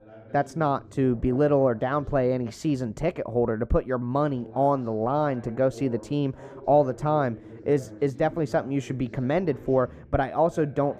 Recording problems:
muffled; very; fading above 1.5 kHz
voice in the background; noticeable; throughout; 20 dB below the speech

